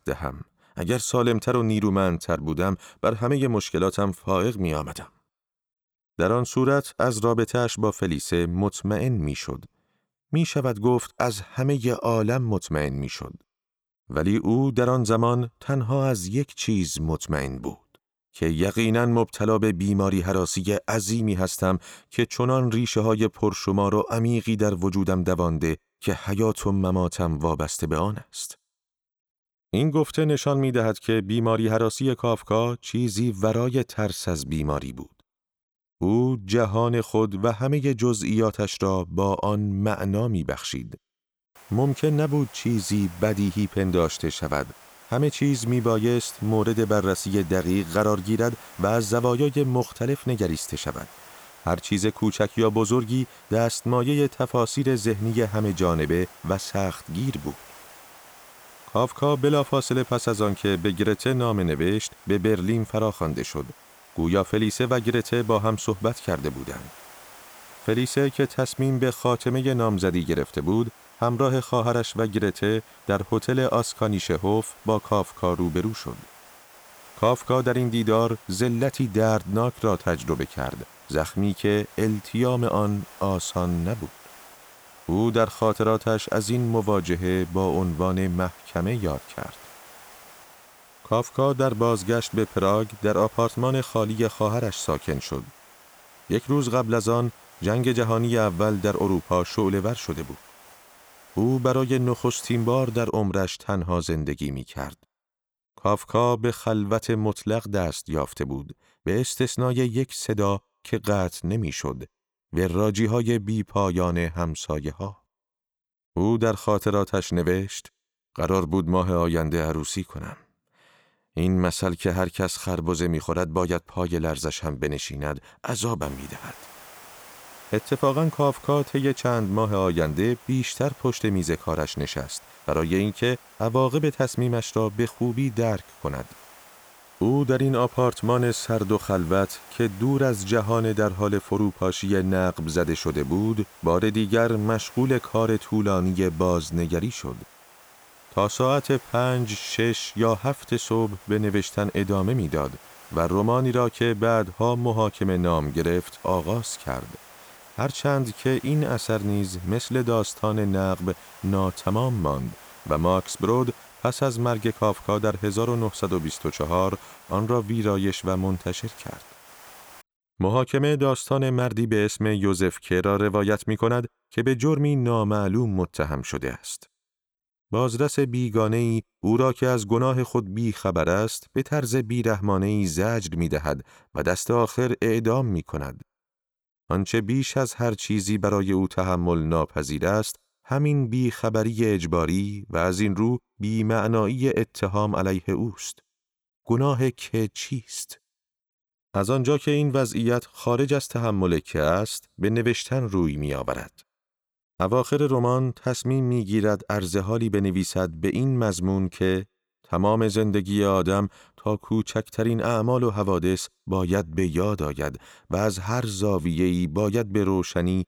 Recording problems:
hiss; faint; from 42 s to 1:43 and from 2:06 to 2:50; 20 dB below the speech

